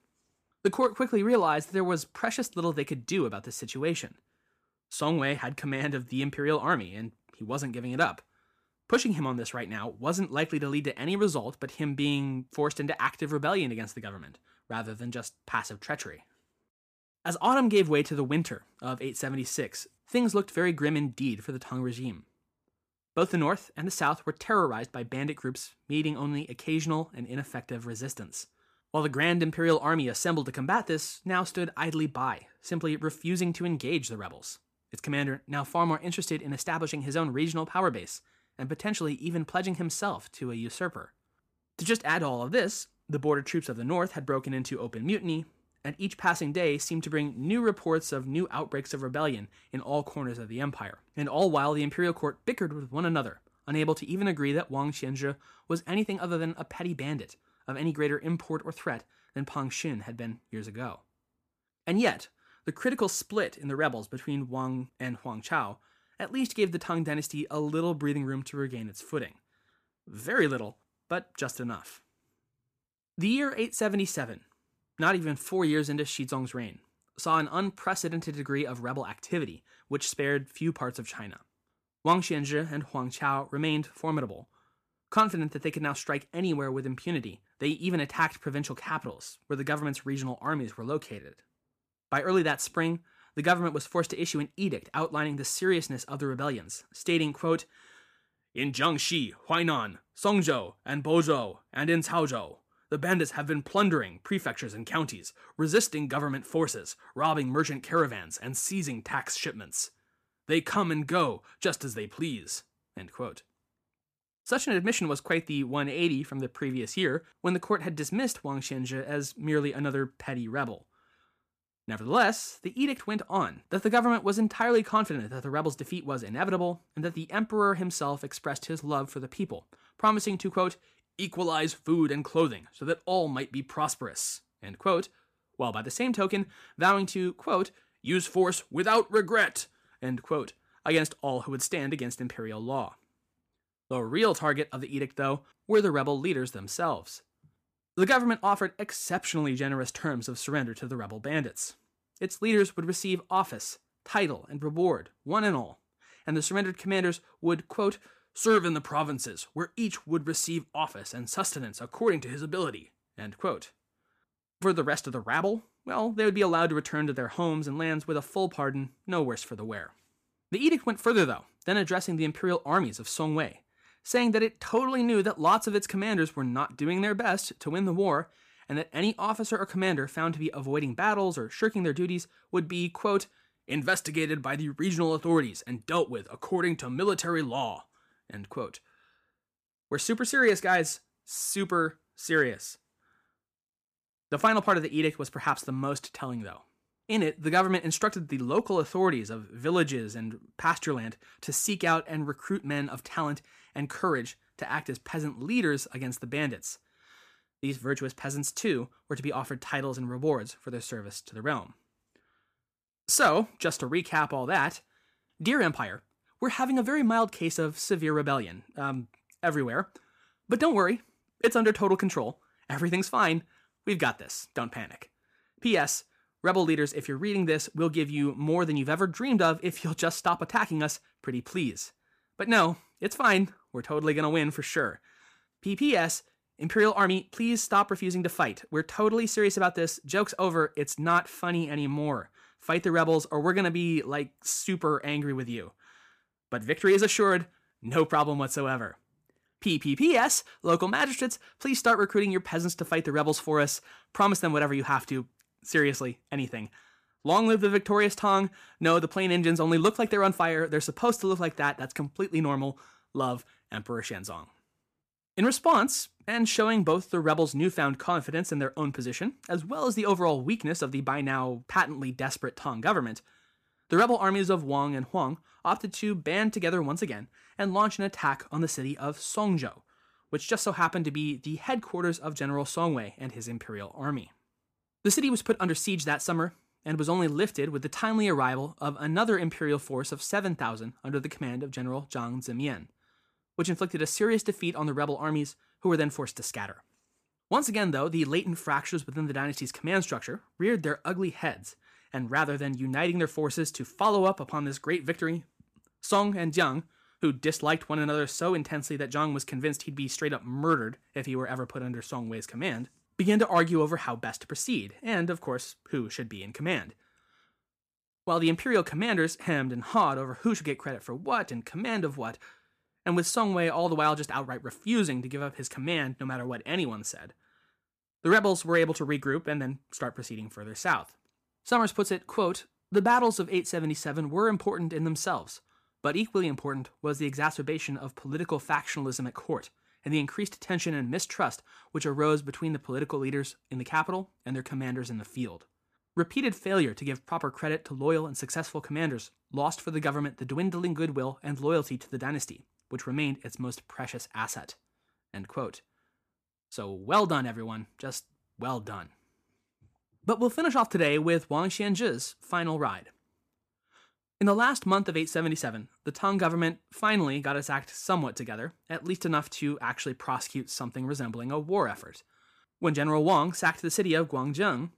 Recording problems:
none

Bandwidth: 15 kHz